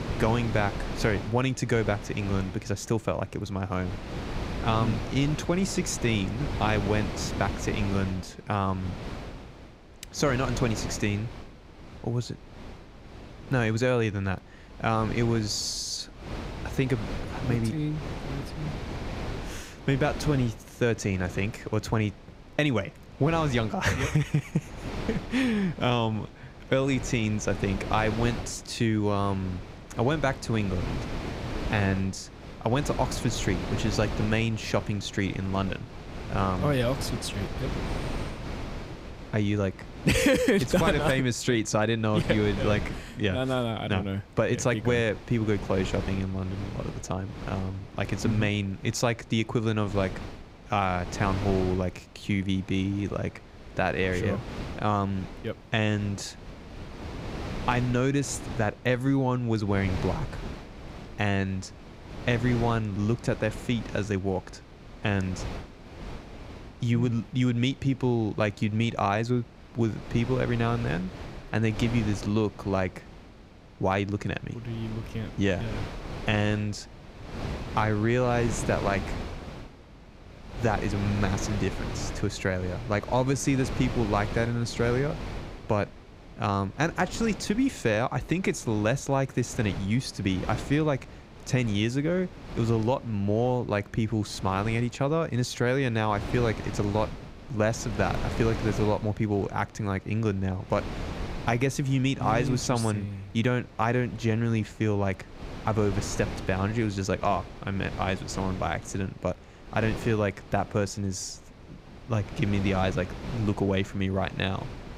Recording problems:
wind noise on the microphone; occasional gusts; 10 dB below the speech

